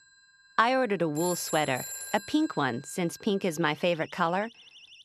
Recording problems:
alarms or sirens; noticeable; throughout; 10 dB below the speech

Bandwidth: 13.5 kHz